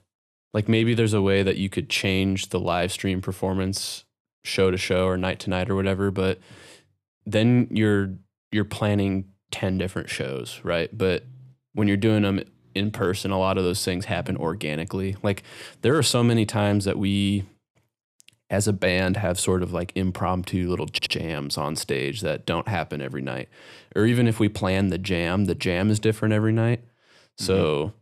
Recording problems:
audio stuttering; at 21 s

